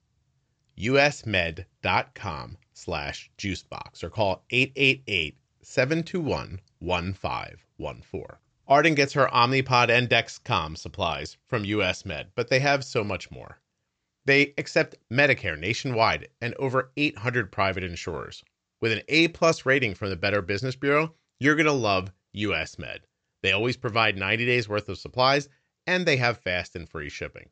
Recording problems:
high frequencies cut off; noticeable; nothing above 8 kHz

